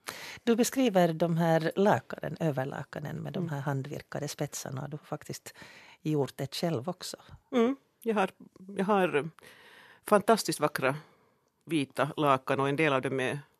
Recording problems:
none

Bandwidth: 13.5 kHz